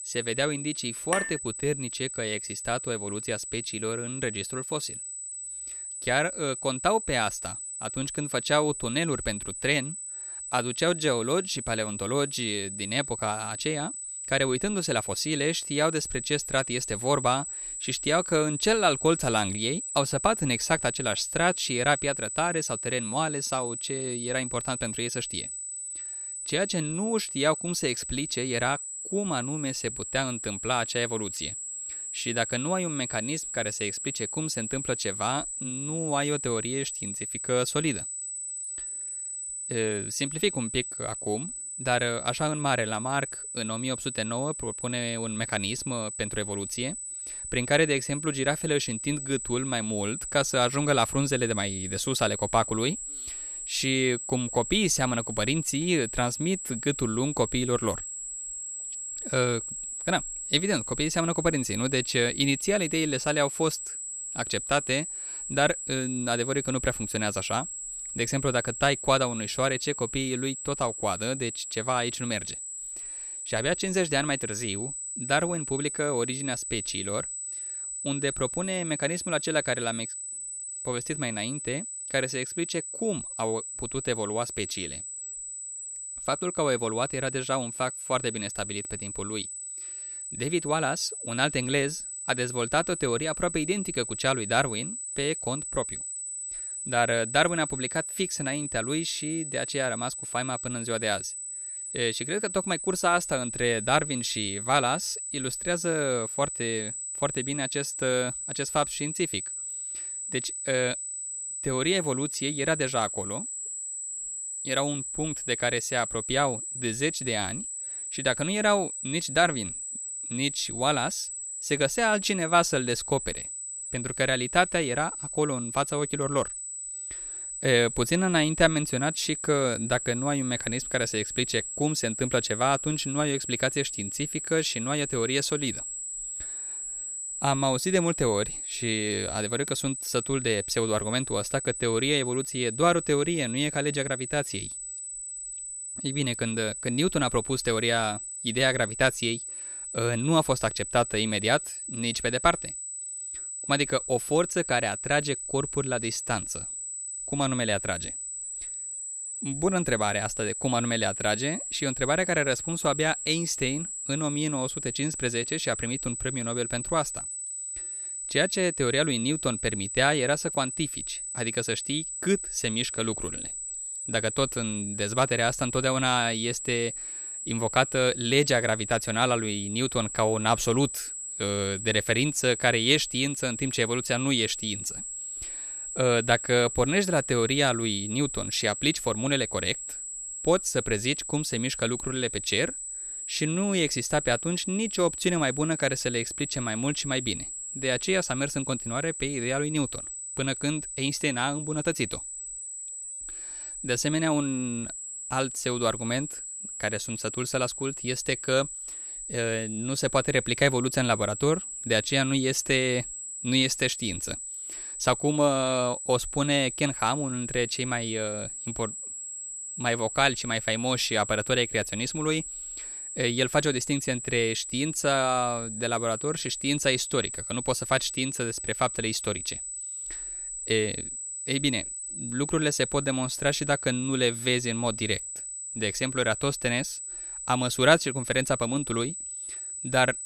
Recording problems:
high-pitched whine; loud; throughout; 8 kHz, 6 dB below the speech
clattering dishes; noticeable; at 1 s; peak 3 dB below the speech

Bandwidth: 14.5 kHz